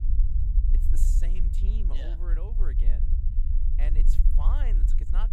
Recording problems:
low rumble; loud; throughout; 3 dB below the speech

